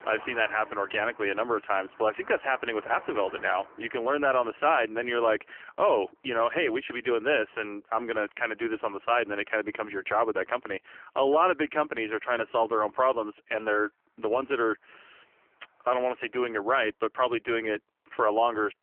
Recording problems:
phone-call audio; poor line; nothing above 3 kHz
traffic noise; faint; throughout; 20 dB below the speech

